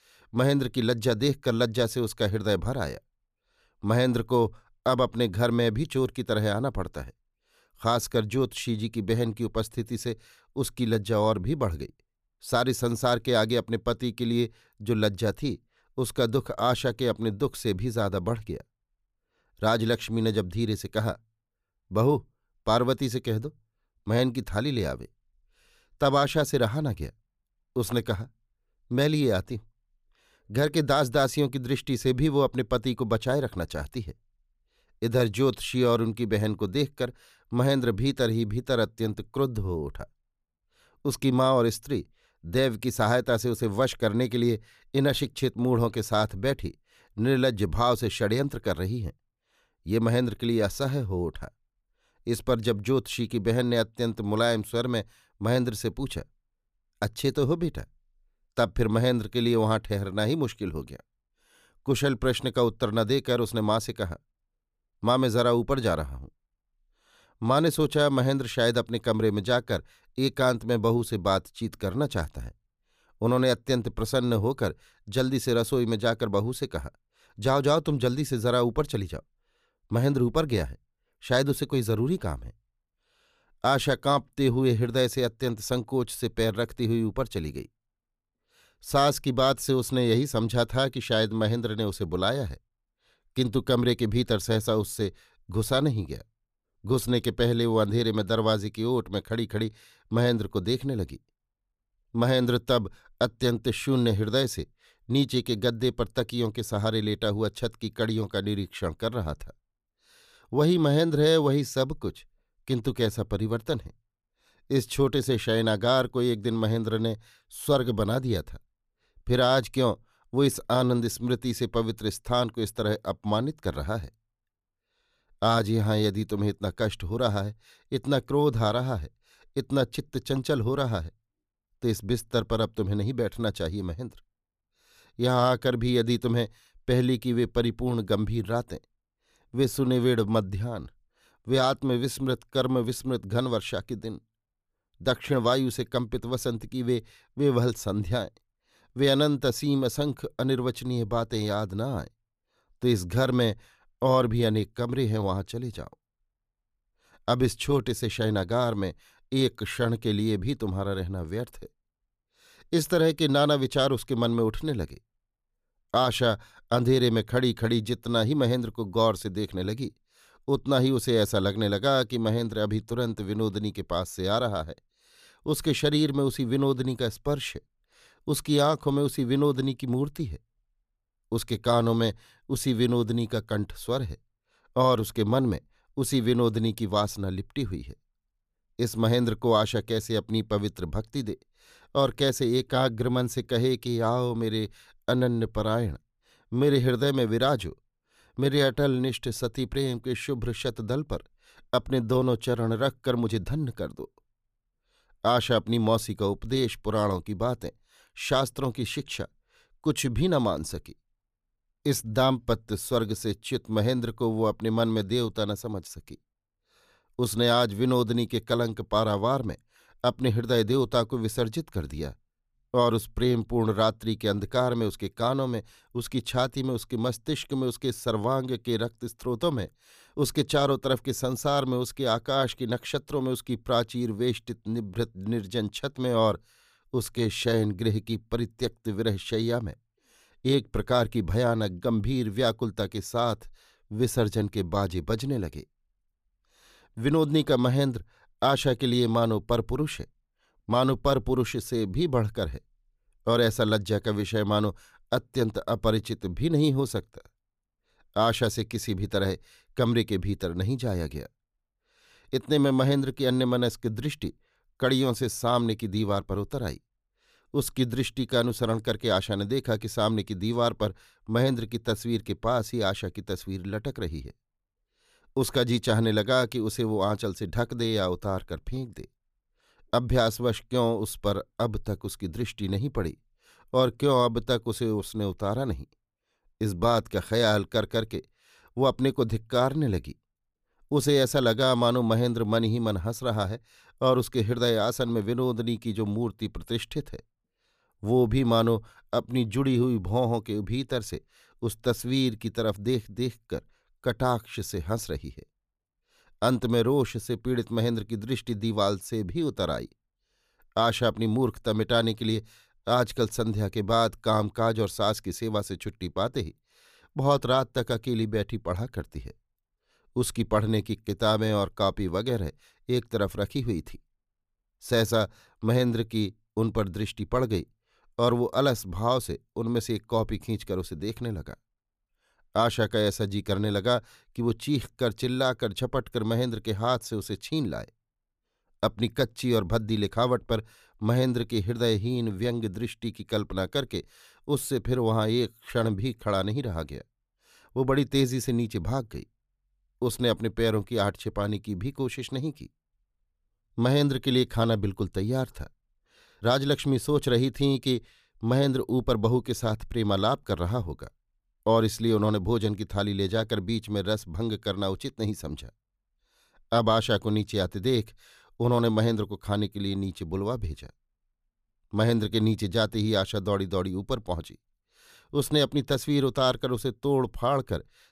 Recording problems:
none

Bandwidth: 14.5 kHz